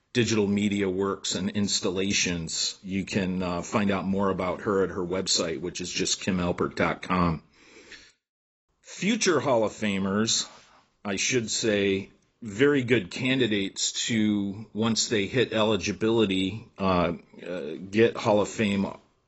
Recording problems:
garbled, watery; badly; nothing above 8 kHz

